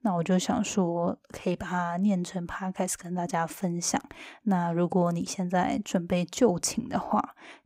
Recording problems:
none

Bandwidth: 15.5 kHz